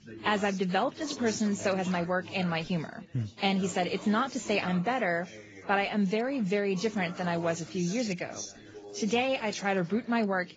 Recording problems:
garbled, watery; badly; nothing above 7.5 kHz
background chatter; noticeable; throughout; 4 voices, 15 dB below the speech

